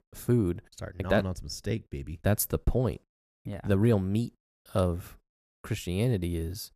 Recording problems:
none

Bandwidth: 14.5 kHz